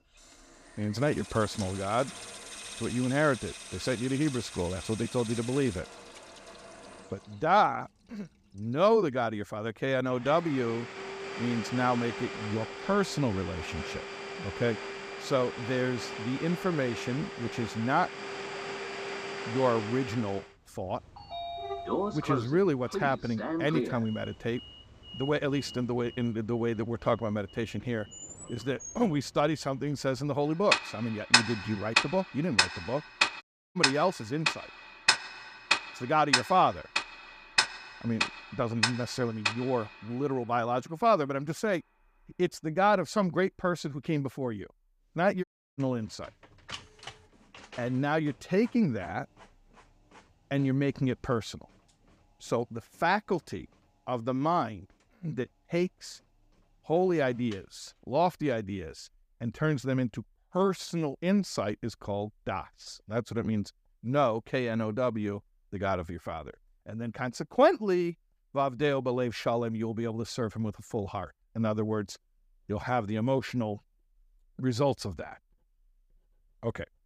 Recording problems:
household noises; loud; throughout; 3 dB below the speech
audio cutting out; at 33 s and at 45 s

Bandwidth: 15 kHz